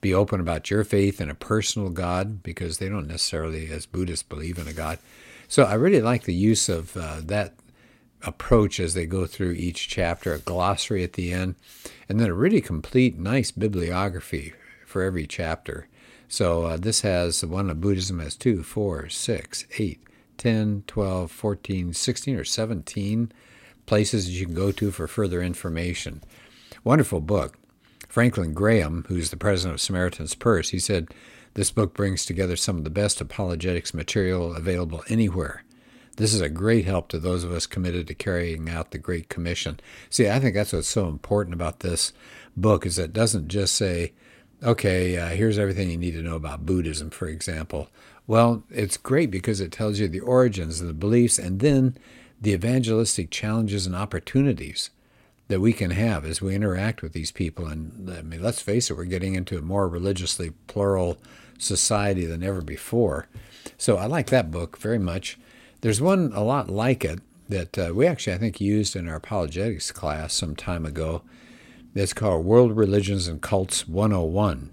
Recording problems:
none

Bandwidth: 16 kHz